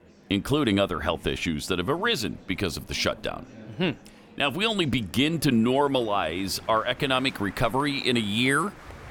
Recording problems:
murmuring crowd; faint; throughout; 20 dB below the speech

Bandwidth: 17.5 kHz